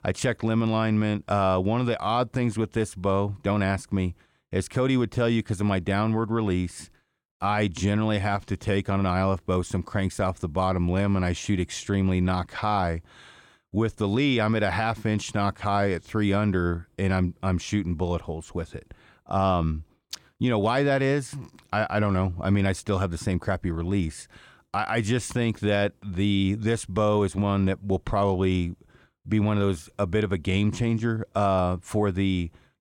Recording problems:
none

